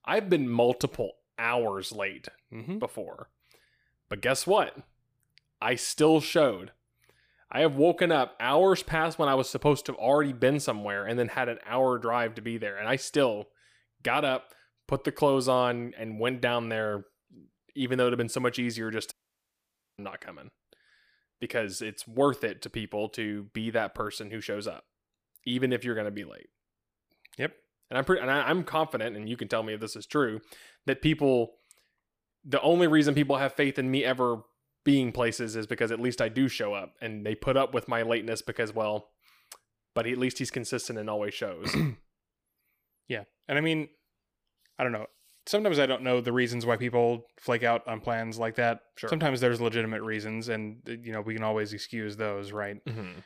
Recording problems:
audio cutting out; at 19 s for 1 s

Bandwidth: 15 kHz